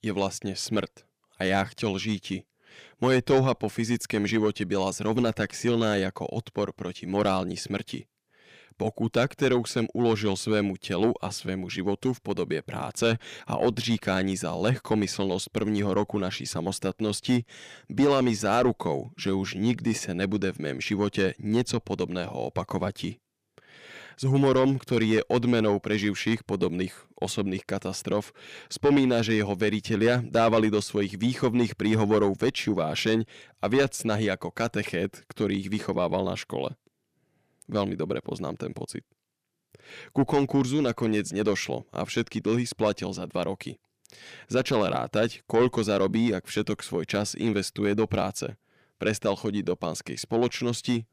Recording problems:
distortion; slight; 10 dB below the speech

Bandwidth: 15 kHz